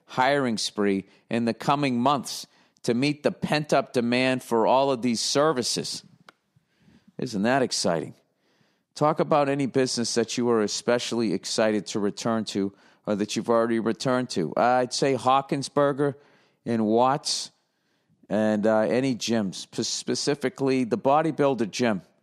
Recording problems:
none

